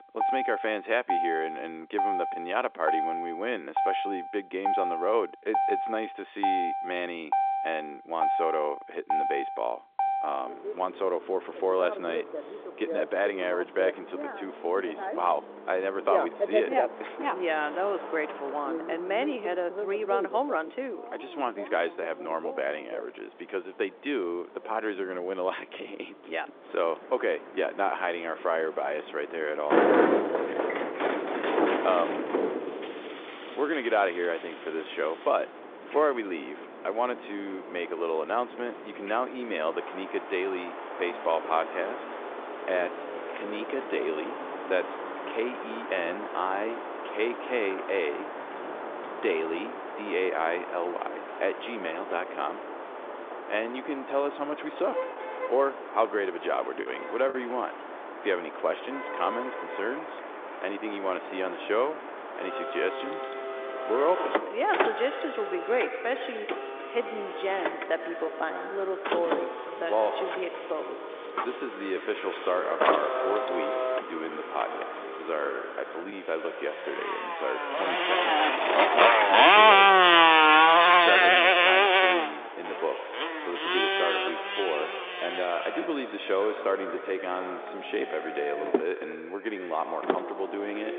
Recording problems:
echo of what is said; strong; from 1:04 on; 90 ms later, 8 dB below the speech
phone-call audio; nothing above 3.5 kHz
traffic noise; very loud; throughout; 4 dB above the speech
choppy; occasionally; at 57 s; 1% of the speech affected

